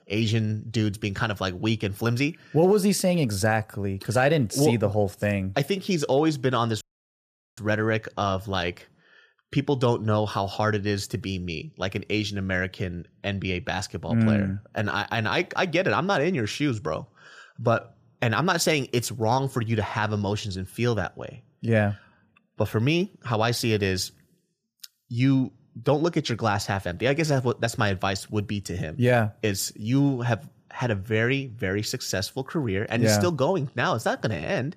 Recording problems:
audio cutting out; at 7 s for 1 s

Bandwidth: 14.5 kHz